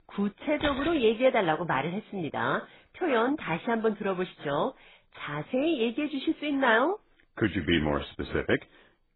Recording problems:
garbled, watery; badly; nothing above 4 kHz
jangling keys; noticeable; at 0.5 s; peak 6 dB below the speech

